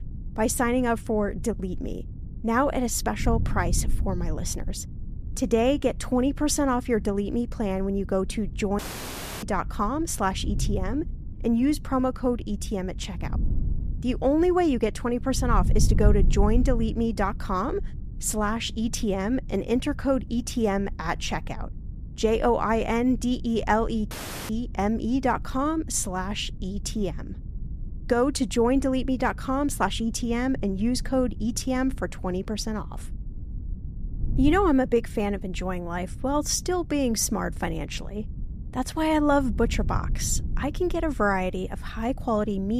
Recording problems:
wind noise on the microphone; occasional gusts; 20 dB below the speech
audio cutting out; at 9 s for 0.5 s and at 24 s
abrupt cut into speech; at the end

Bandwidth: 14.5 kHz